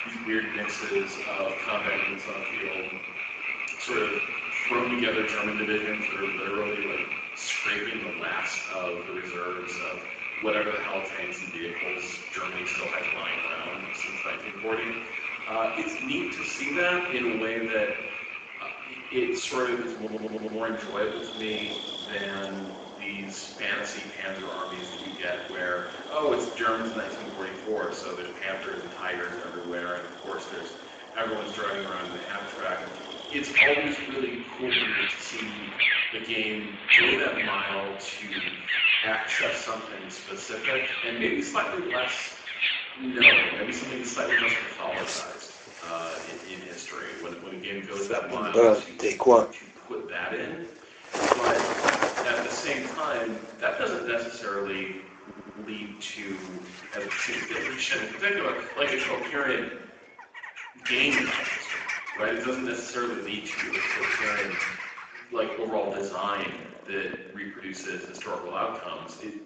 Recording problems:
off-mic speech; far
garbled, watery; badly; nothing above 7.5 kHz
room echo; noticeable; dies away in 0.9 s
thin; very slightly; fading below 300 Hz
animal sounds; very loud; throughout; 3 dB above the speech
audio stuttering; at 20 s and at 55 s

